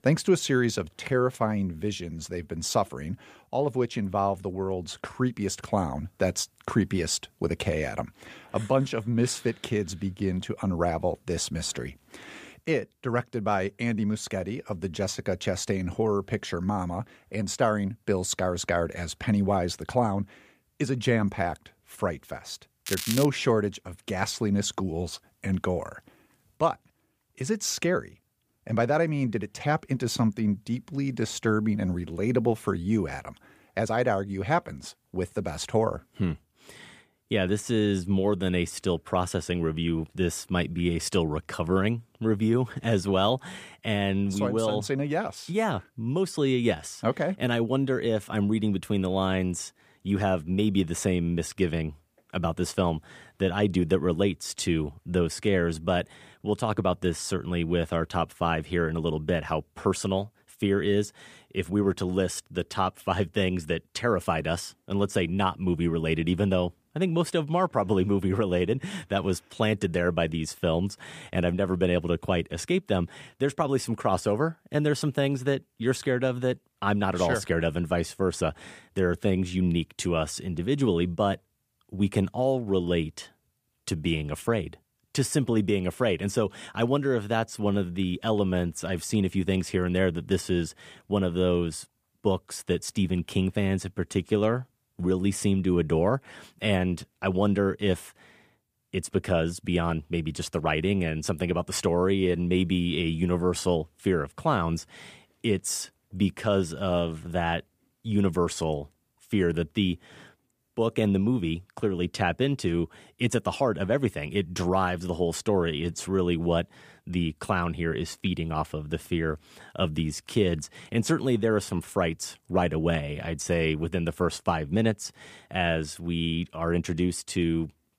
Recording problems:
crackling; loud; at 23 s; 5 dB below the speech

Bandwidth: 15 kHz